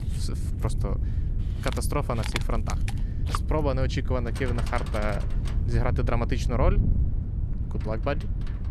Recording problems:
animal sounds; loud; throughout; 9 dB below the speech
wind noise on the microphone; occasional gusts; 10 dB below the speech

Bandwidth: 13.5 kHz